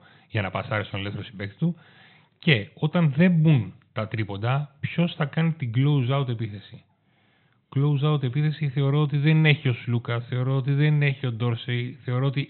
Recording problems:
high frequencies cut off; severe; nothing above 4 kHz

